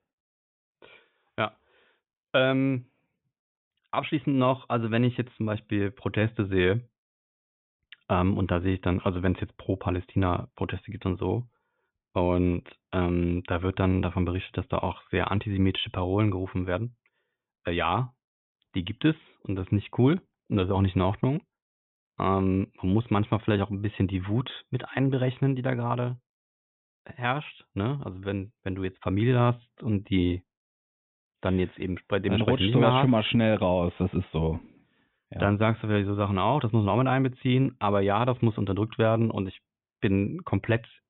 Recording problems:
high frequencies cut off; severe; nothing above 3.5 kHz

